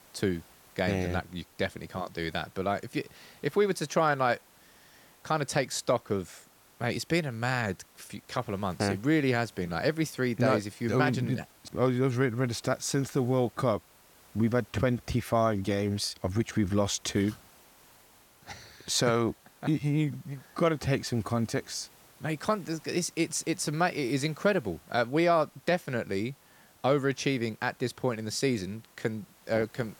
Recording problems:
hiss; faint; throughout; 25 dB below the speech

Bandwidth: 17.5 kHz